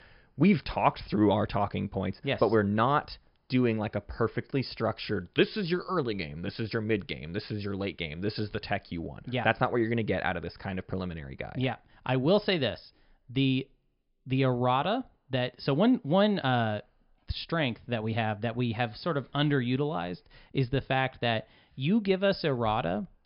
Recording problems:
high frequencies cut off; noticeable; nothing above 5.5 kHz

